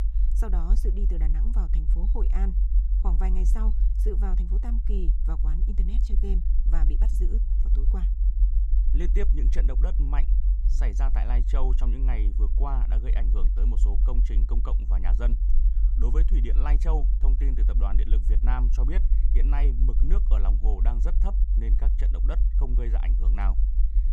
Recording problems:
low rumble; loud; throughout; 7 dB below the speech

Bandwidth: 14.5 kHz